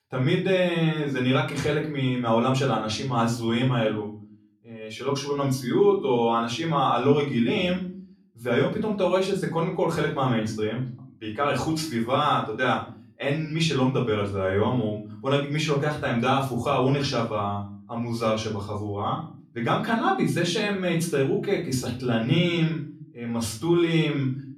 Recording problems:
off-mic speech; far
room echo; slight; dies away in 0.4 s

